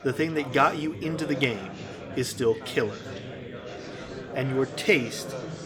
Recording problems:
chatter from many people; noticeable; throughout; 10 dB below the speech

